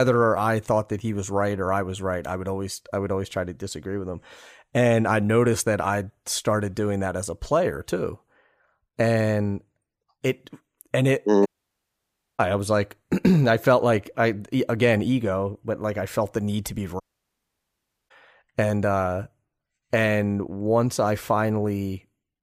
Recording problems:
abrupt cut into speech; at the start
audio cutting out; at 11 s for 1 s and at 17 s for 1 s

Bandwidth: 15 kHz